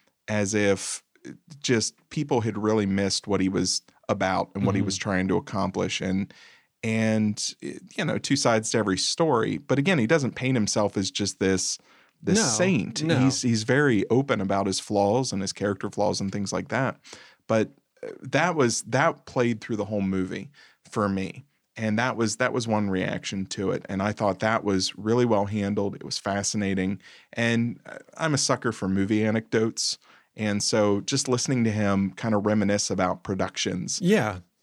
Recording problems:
none

